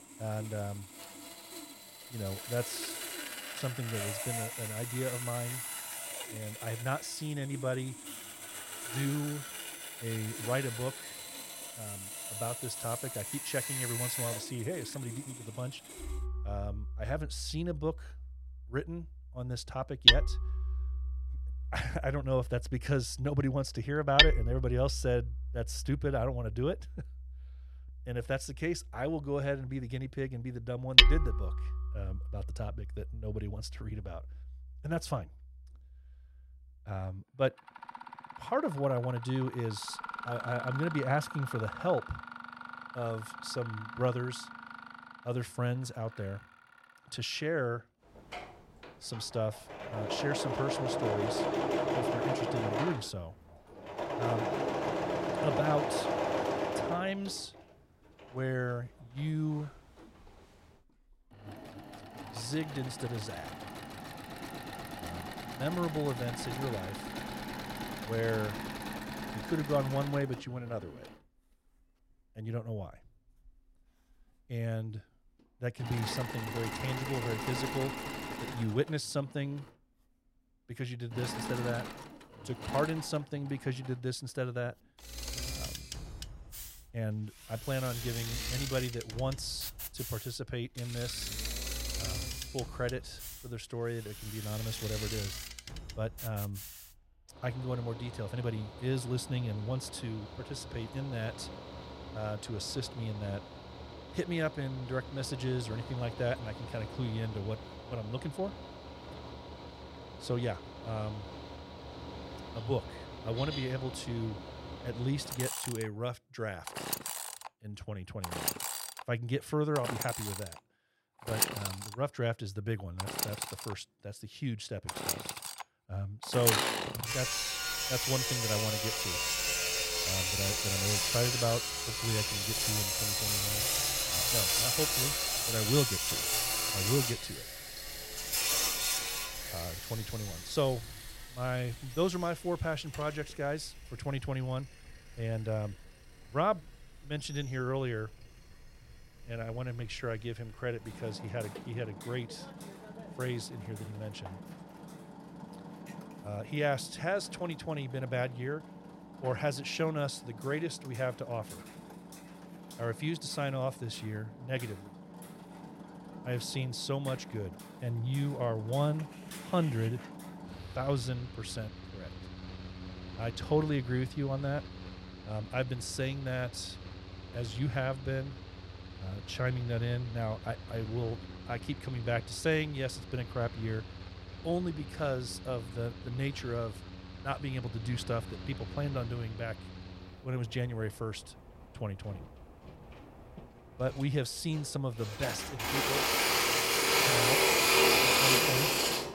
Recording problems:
machinery noise; very loud; throughout; 3 dB above the speech

